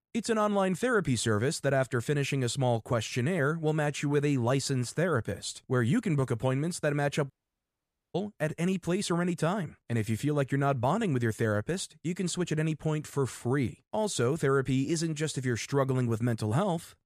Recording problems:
audio cutting out; at 7.5 s for 1 s

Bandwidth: 14.5 kHz